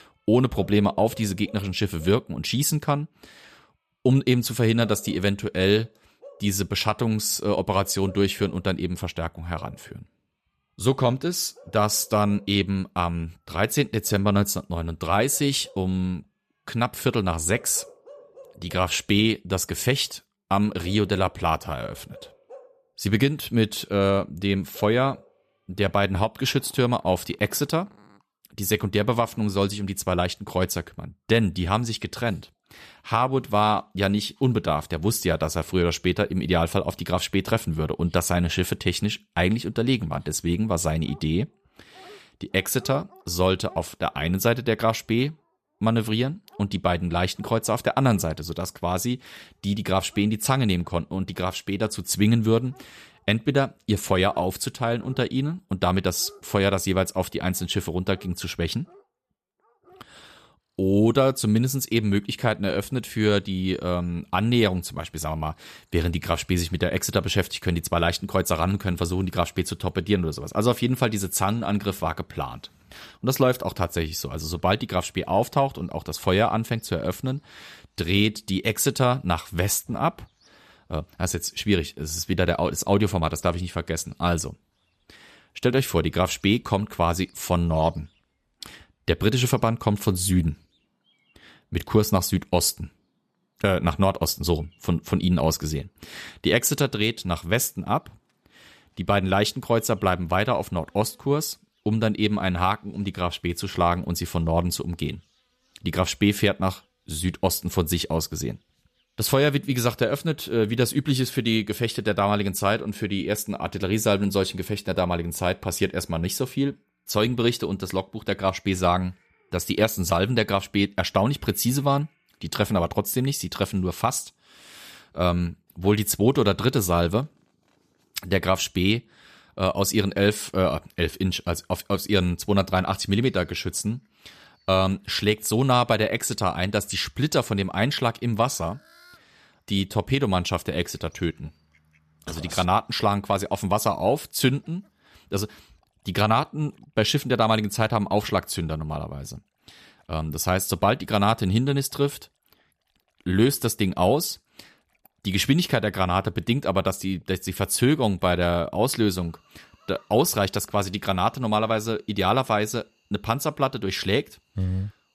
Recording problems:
animal sounds; faint; throughout; 30 dB below the speech

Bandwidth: 14.5 kHz